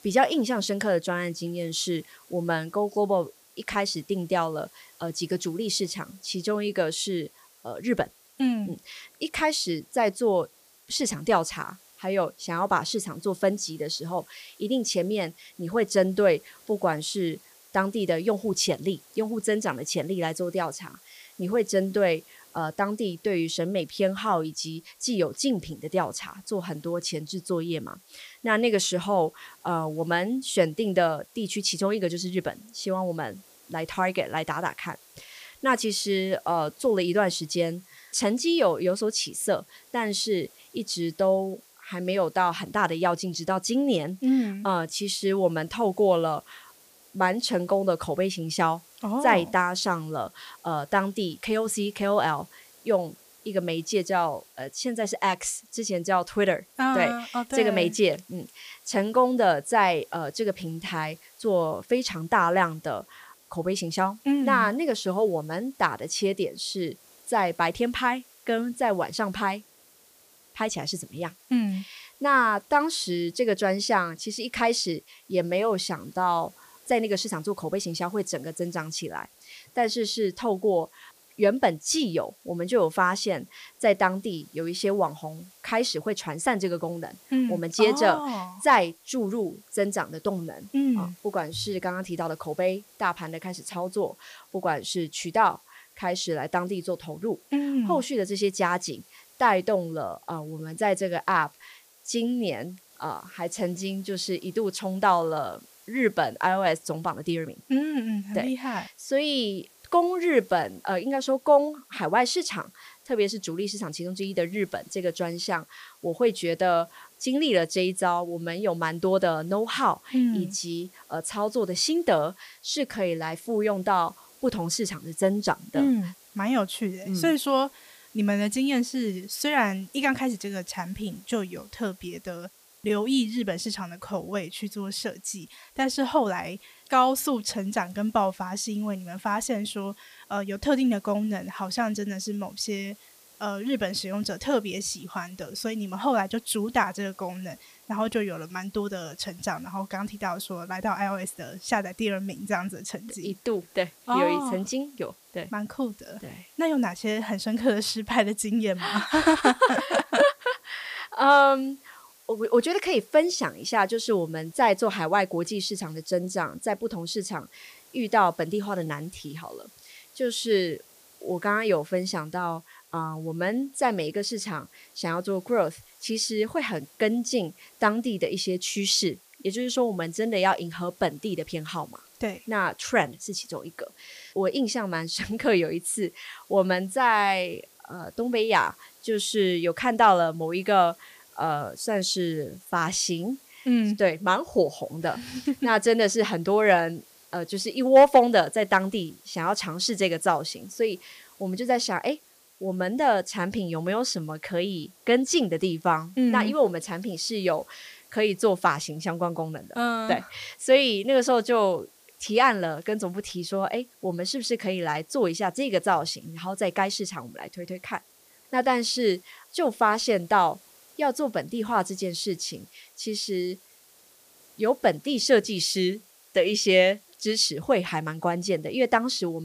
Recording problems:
hiss; faint; throughout; 25 dB below the speech
abrupt cut into speech; at the end

